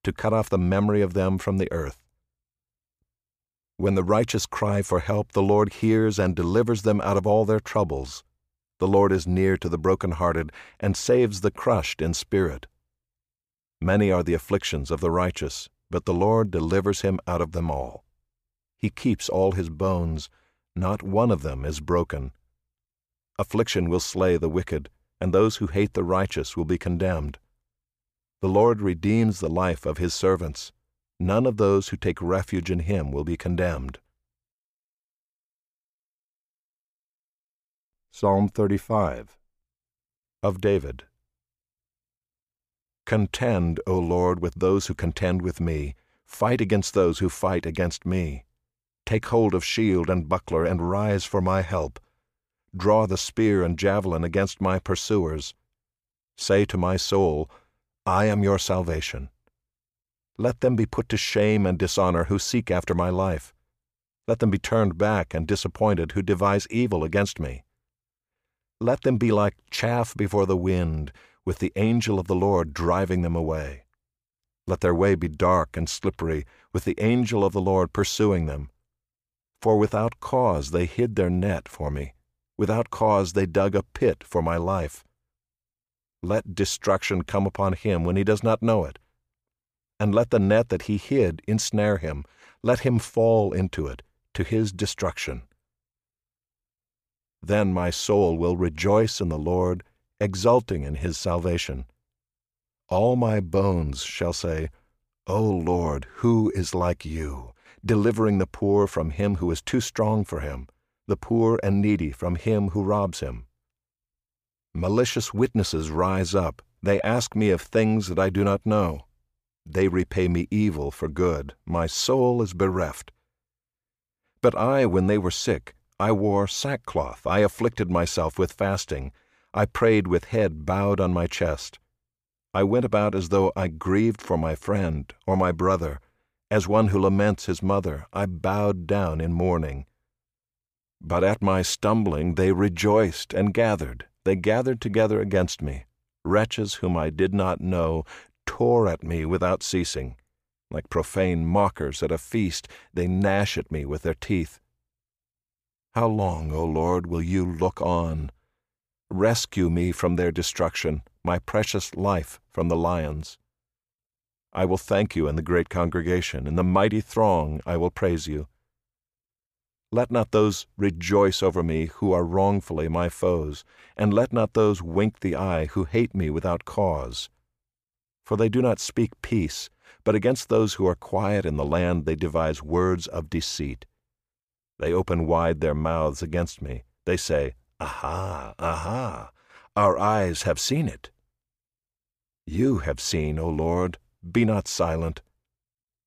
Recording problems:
none

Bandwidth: 15 kHz